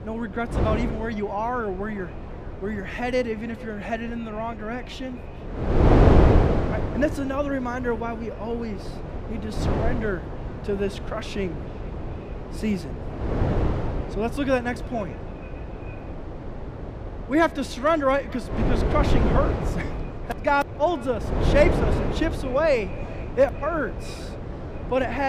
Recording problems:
echo of what is said; faint; throughout; 440 ms later, 20 dB below the speech
wind noise on the microphone; heavy; 5 dB below the speech
abrupt cut into speech; at the end

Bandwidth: 15 kHz